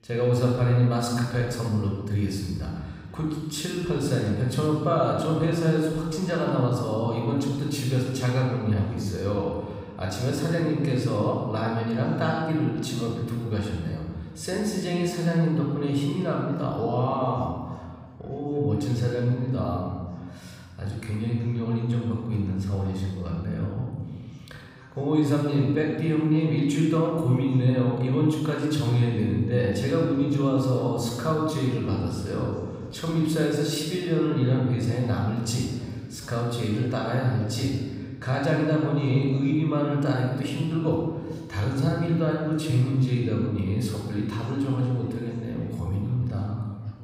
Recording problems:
room echo; noticeable; dies away in 1.4 s
off-mic speech; somewhat distant
voice in the background; faint; throughout; 30 dB below the speech

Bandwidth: 15.5 kHz